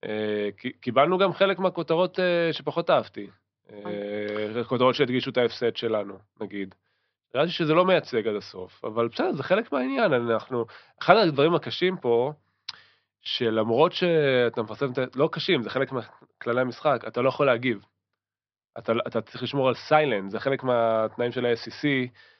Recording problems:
high frequencies cut off; noticeable; nothing above 5.5 kHz

